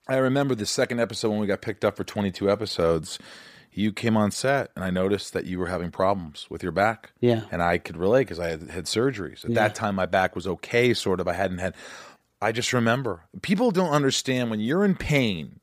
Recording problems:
none

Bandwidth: 15 kHz